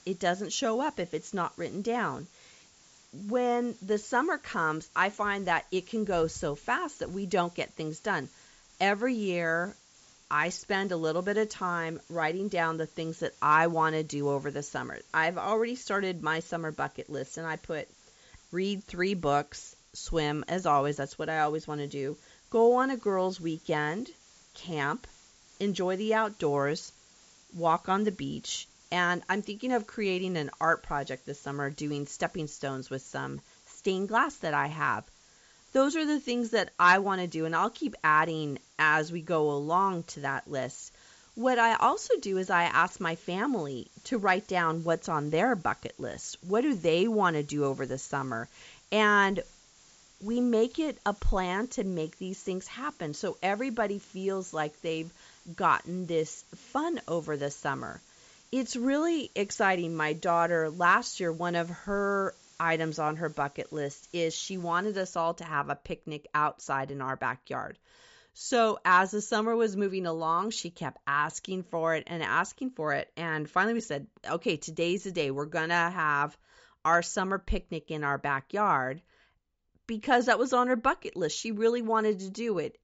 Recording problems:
high frequencies cut off; noticeable; nothing above 8 kHz
hiss; faint; until 1:05; 25 dB below the speech

